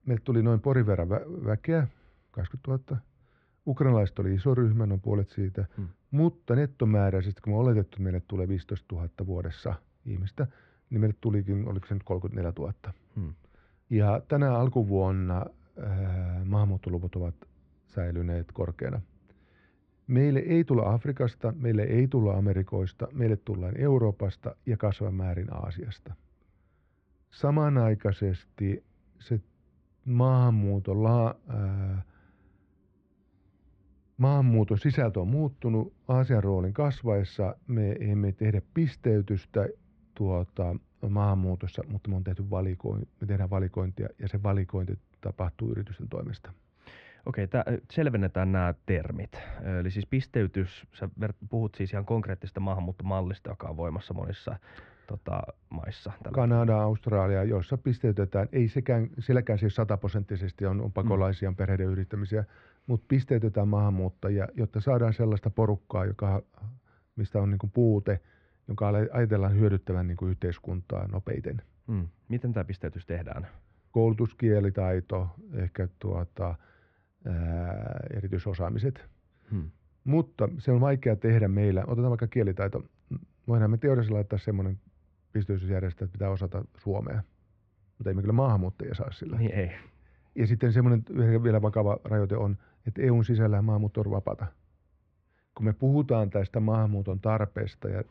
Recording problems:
muffled; very; fading above 2 kHz

